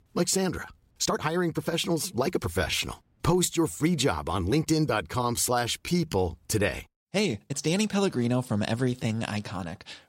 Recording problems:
uneven, jittery; strongly; from 0.5 to 9 s

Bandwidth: 16 kHz